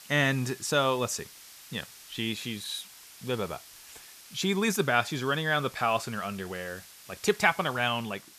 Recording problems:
hiss; noticeable; throughout; 20 dB below the speech

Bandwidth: 14.5 kHz